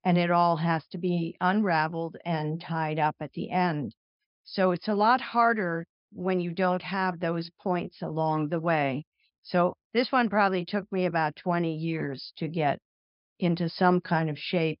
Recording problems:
high frequencies cut off; noticeable; nothing above 5.5 kHz

